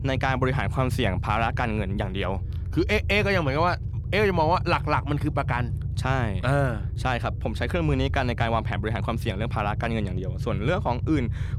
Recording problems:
low rumble; noticeable; throughout; 20 dB below the speech

